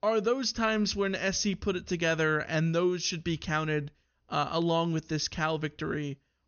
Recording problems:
high frequencies cut off; noticeable; nothing above 6.5 kHz

